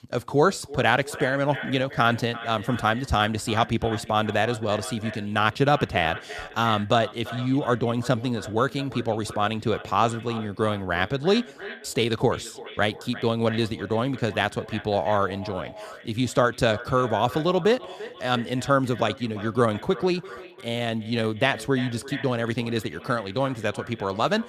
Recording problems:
echo of what is said; noticeable; throughout; 340 ms later, 15 dB below the speech

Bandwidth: 14.5 kHz